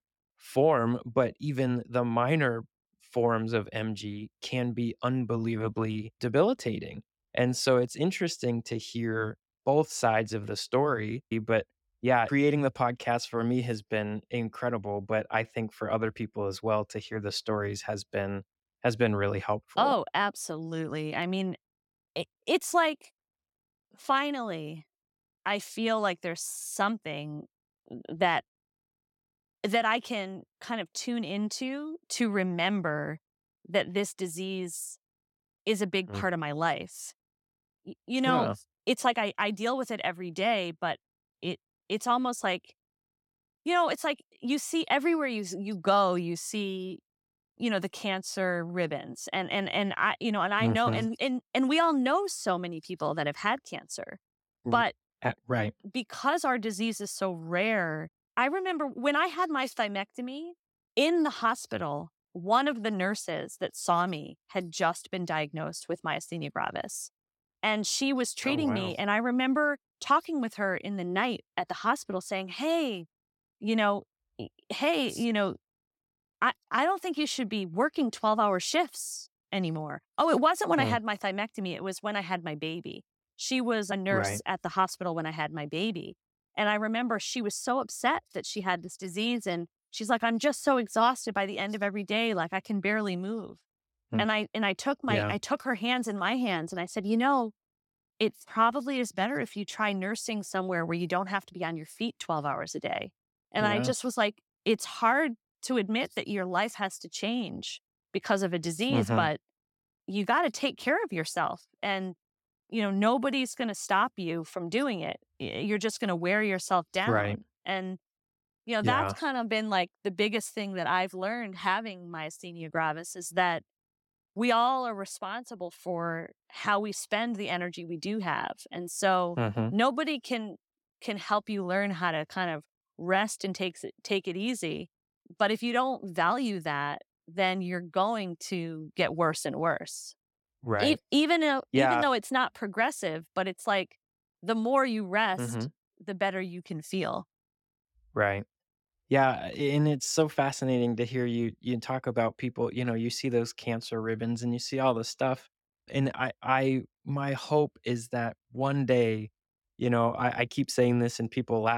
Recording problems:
abrupt cut into speech; at the end

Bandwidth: 17 kHz